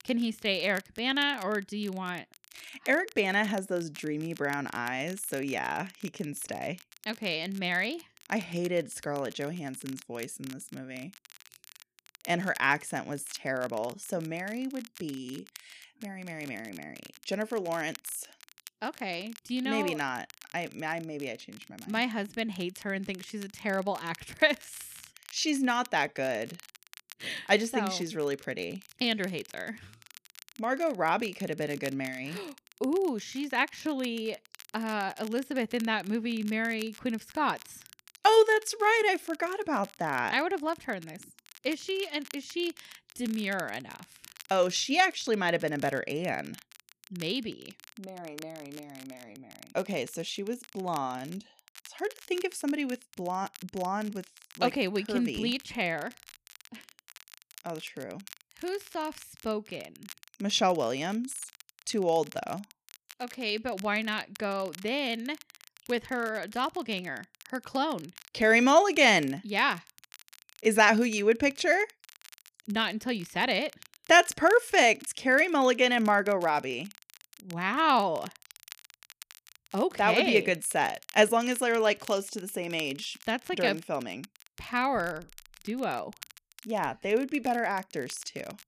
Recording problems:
crackle, like an old record; faint; 20 dB below the speech

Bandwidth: 14.5 kHz